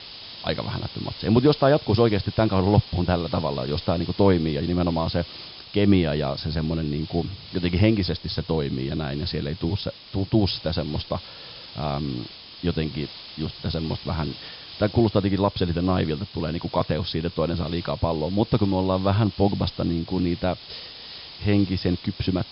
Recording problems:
high frequencies cut off; noticeable; nothing above 5 kHz
hiss; noticeable; throughout; 15 dB below the speech

